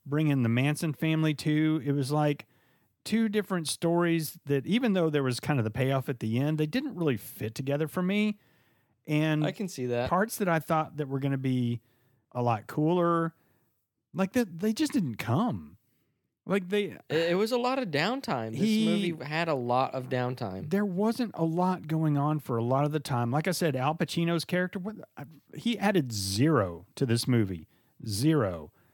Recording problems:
none

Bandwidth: 18 kHz